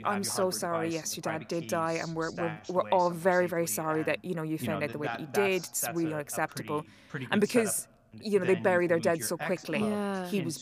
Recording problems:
voice in the background; noticeable; throughout; 10 dB below the speech

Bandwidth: 15 kHz